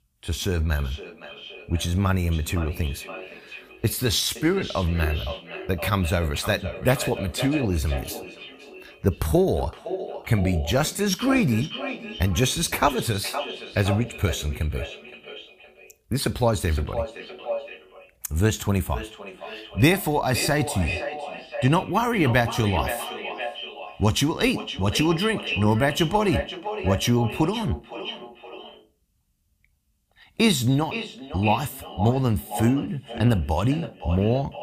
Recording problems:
echo of what is said; strong; throughout; 520 ms later, 10 dB below the speech

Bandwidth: 15 kHz